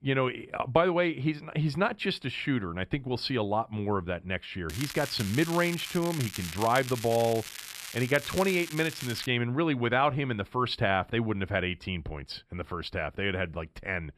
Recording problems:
crackling; loud; from 4.5 to 9.5 s; 9 dB below the speech

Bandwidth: 14 kHz